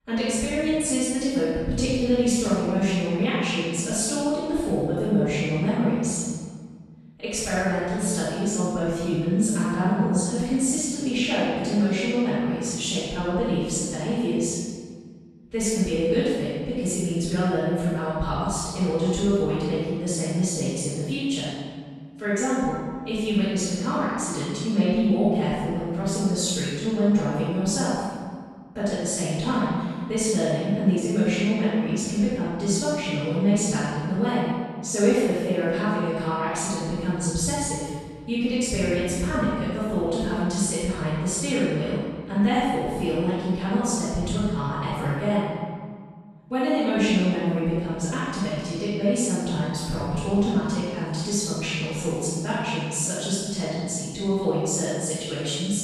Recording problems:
room echo; strong; dies away in 1.6 s
off-mic speech; far

